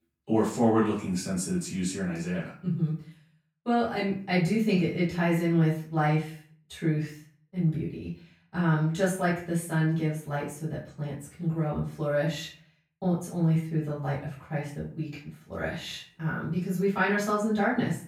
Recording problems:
off-mic speech; far
room echo; noticeable; dies away in 0.4 s

